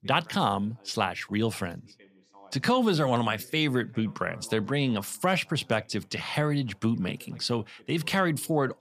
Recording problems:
voice in the background; faint; throughout; 25 dB below the speech

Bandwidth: 14.5 kHz